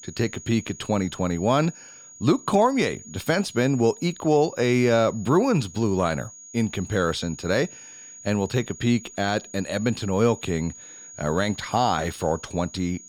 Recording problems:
high-pitched whine; noticeable; throughout; 6.5 kHz, 15 dB below the speech

